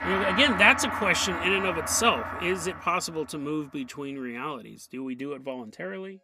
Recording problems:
background music; loud; throughout; 6 dB below the speech

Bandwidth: 15 kHz